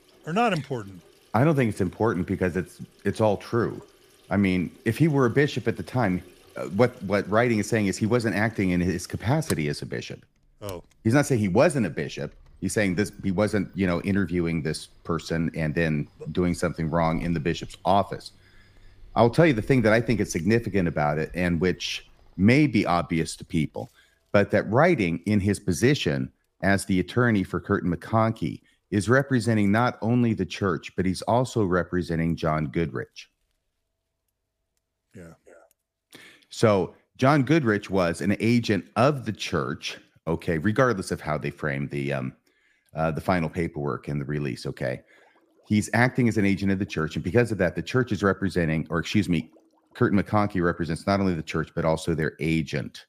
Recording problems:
household noises; faint; throughout; 30 dB below the speech

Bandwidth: 15 kHz